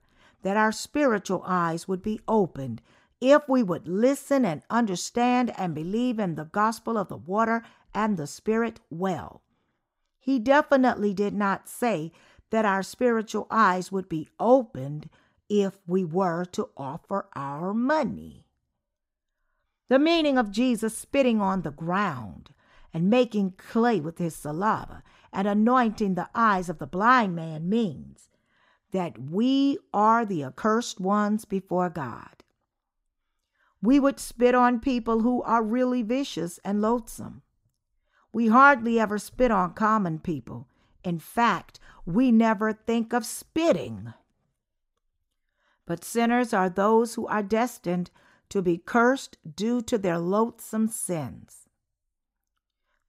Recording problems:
none

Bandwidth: 15.5 kHz